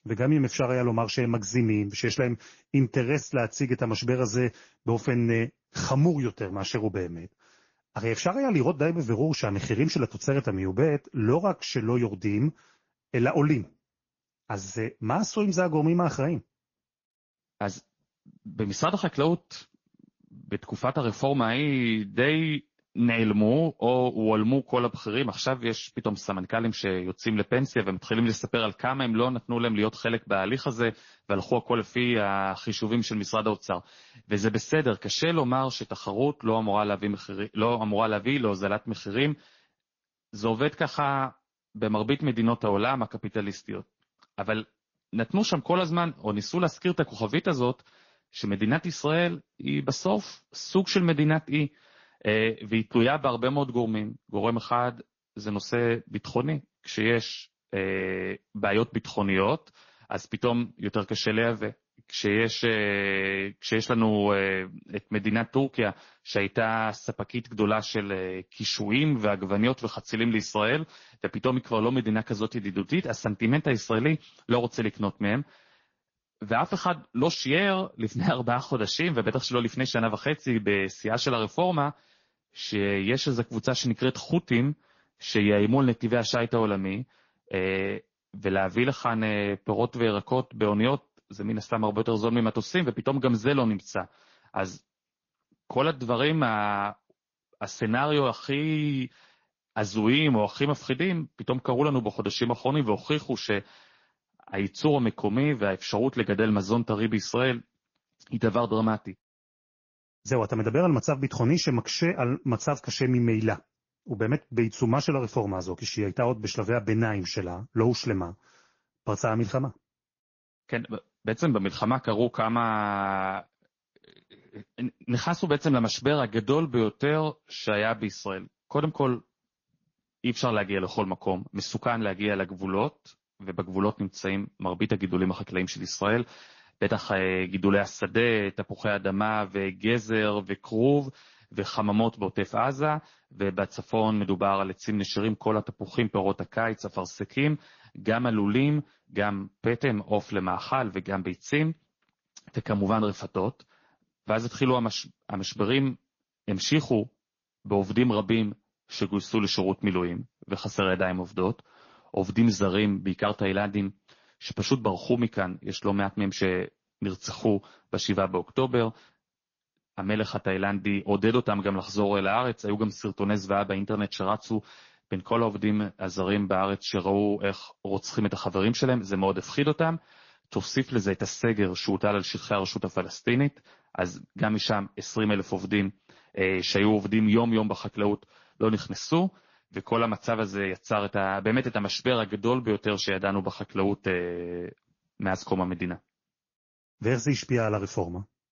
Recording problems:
garbled, watery; slightly; nothing above 6.5 kHz
high frequencies cut off; slight

